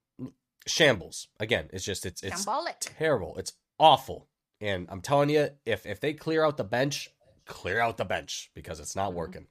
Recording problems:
none

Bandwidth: 14.5 kHz